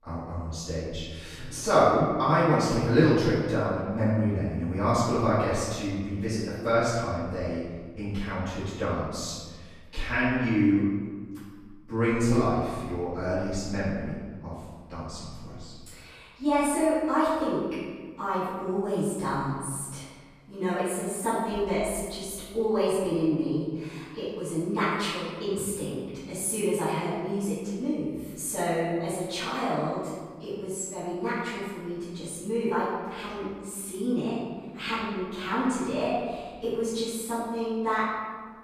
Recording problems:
room echo; strong; dies away in 1.4 s
off-mic speech; far

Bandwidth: 14.5 kHz